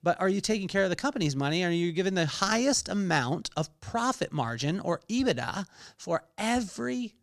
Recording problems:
none

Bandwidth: 14.5 kHz